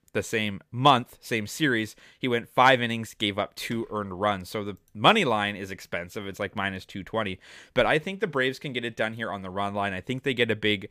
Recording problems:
none

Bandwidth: 15 kHz